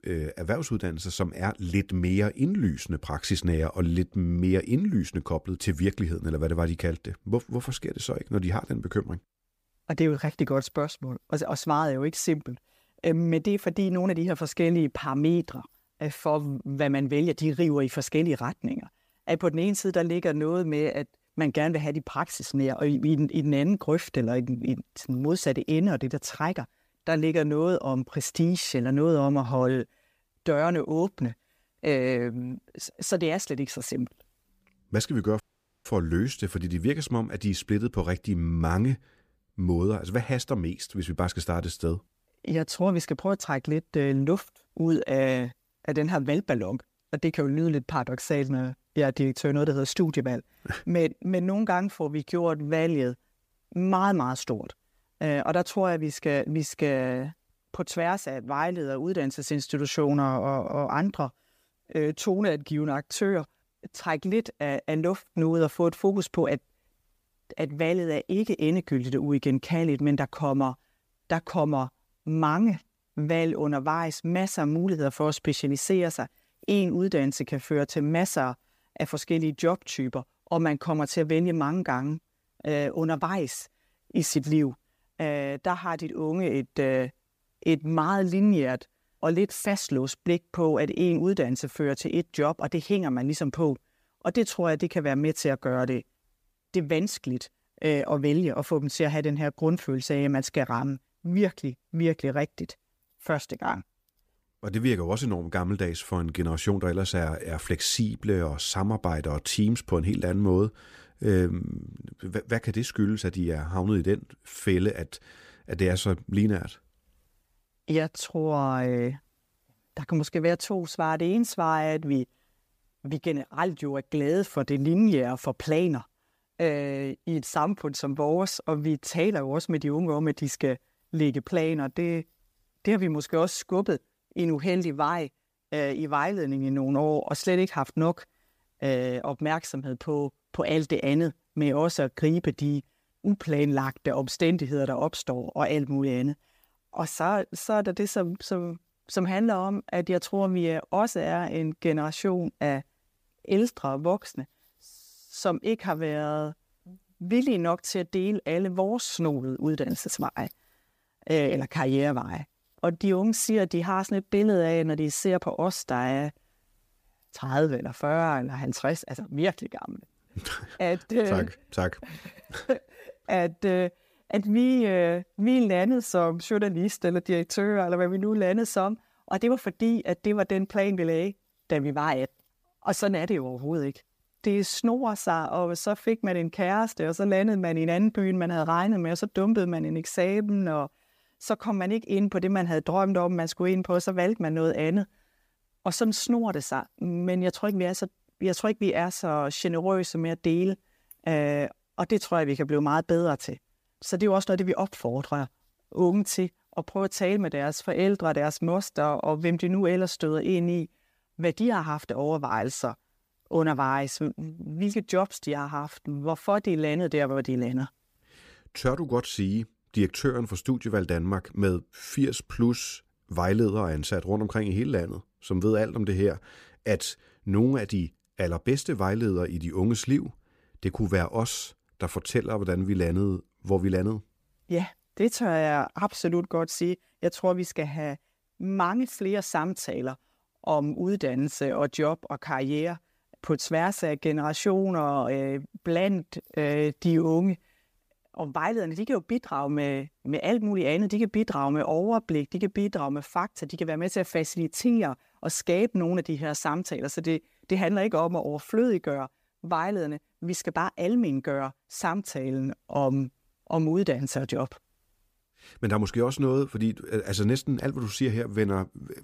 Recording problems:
audio cutting out; at 35 s

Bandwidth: 15 kHz